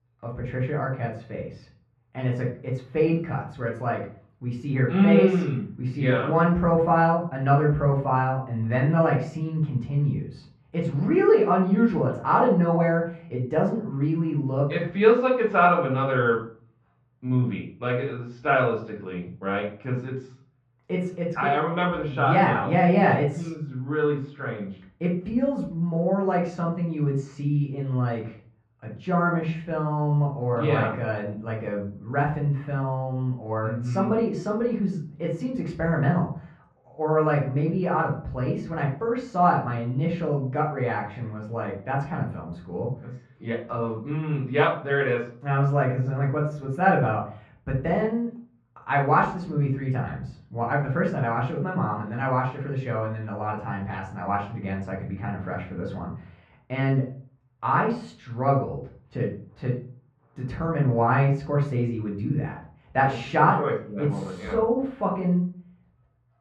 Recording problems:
off-mic speech; far
muffled; very; fading above 2 kHz
room echo; slight; dies away in 0.4 s

